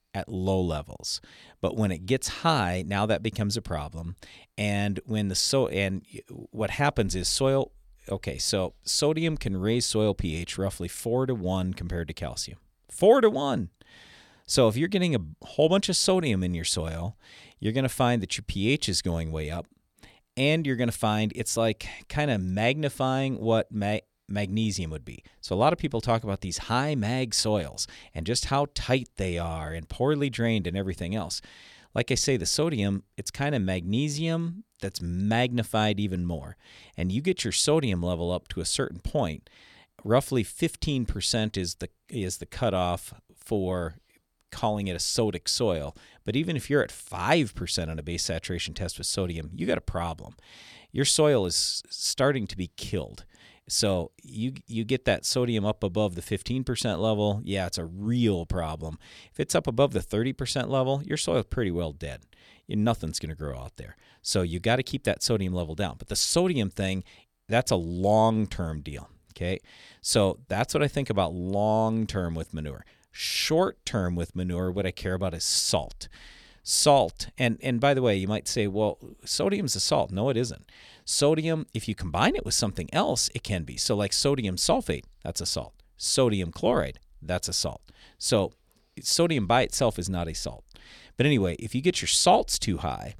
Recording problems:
none

